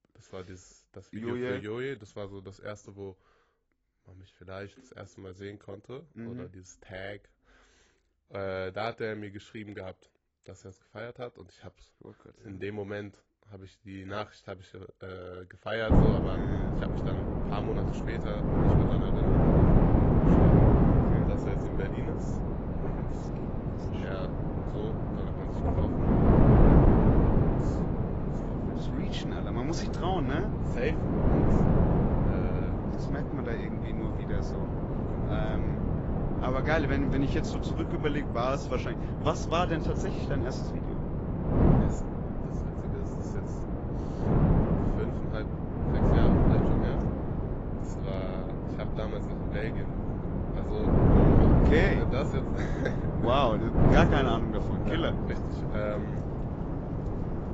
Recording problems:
garbled, watery; badly; nothing above 7.5 kHz
wind noise on the microphone; heavy; from 16 s on; 2 dB above the speech
rain or running water; loud; from 22 s on; 7 dB below the speech

